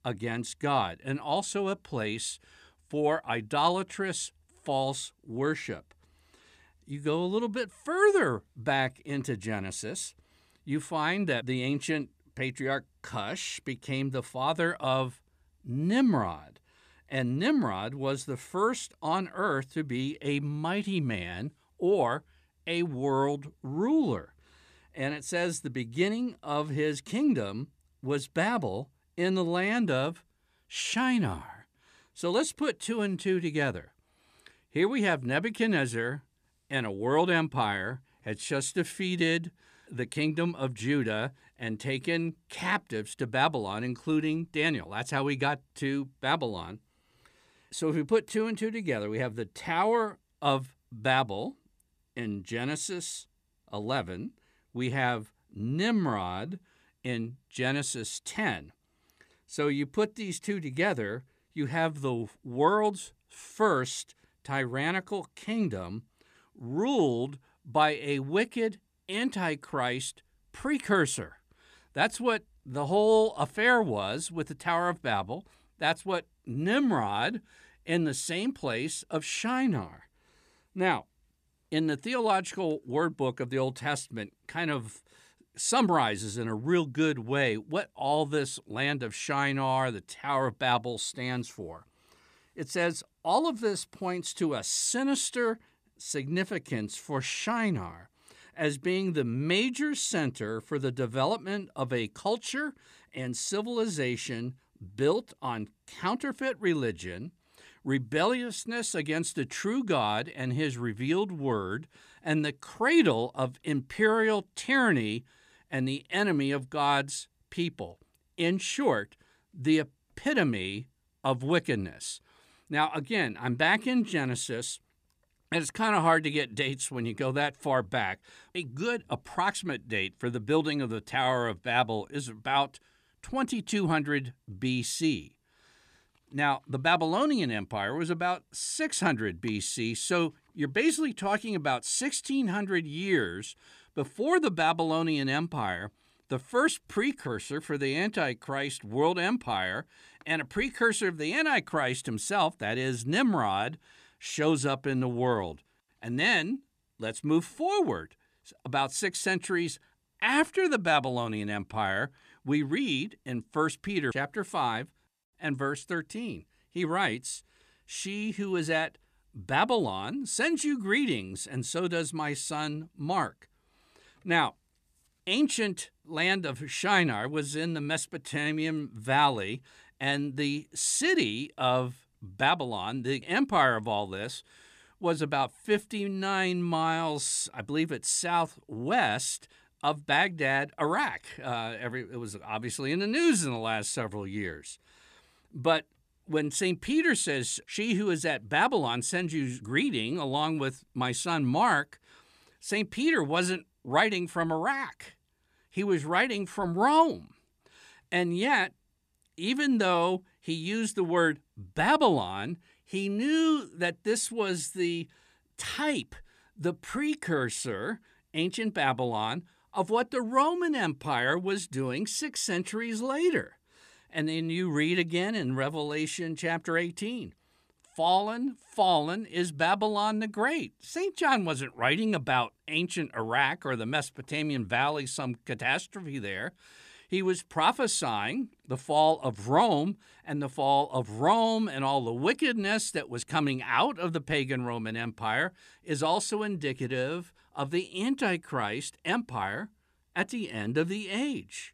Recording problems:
none

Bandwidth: 14.5 kHz